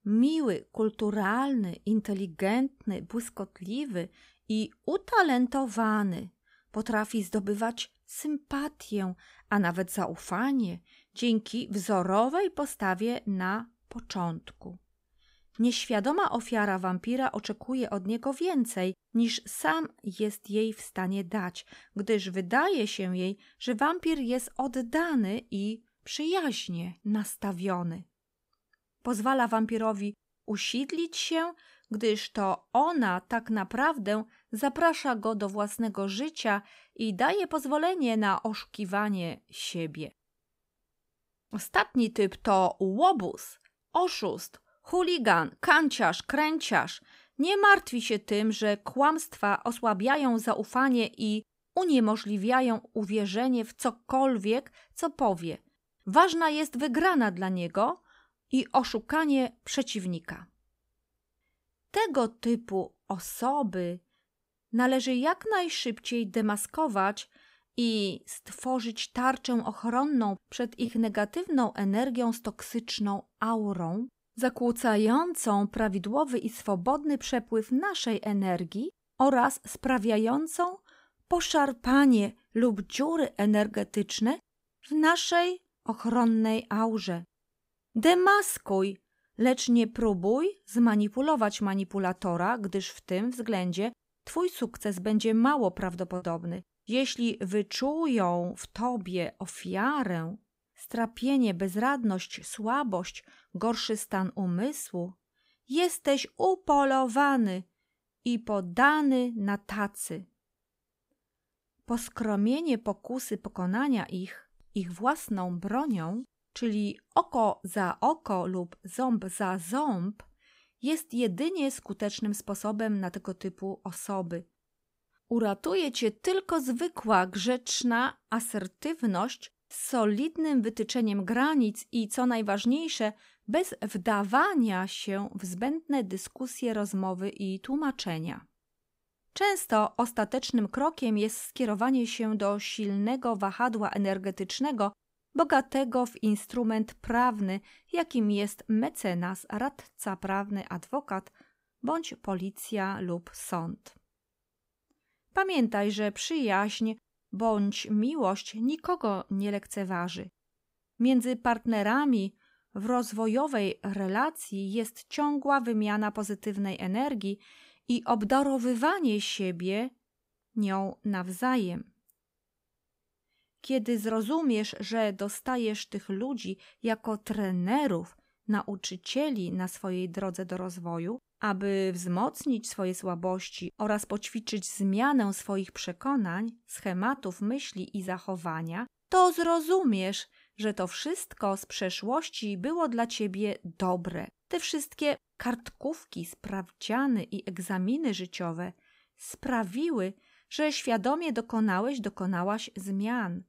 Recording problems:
choppy; occasionally; at 1:36; 1% of the speech affected

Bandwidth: 15.5 kHz